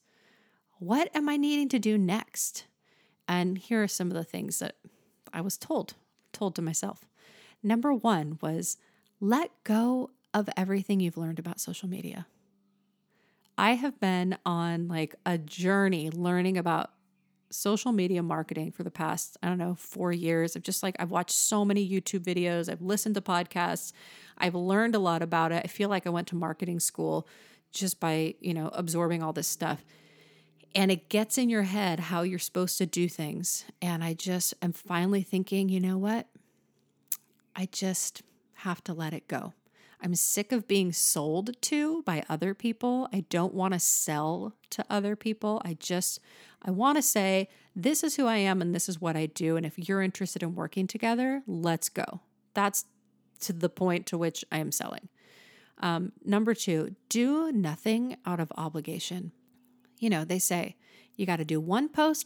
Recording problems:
none

